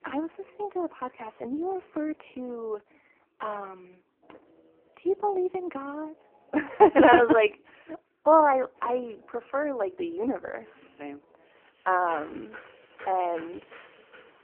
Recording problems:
phone-call audio; poor line
traffic noise; faint; throughout; 25 dB below the speech

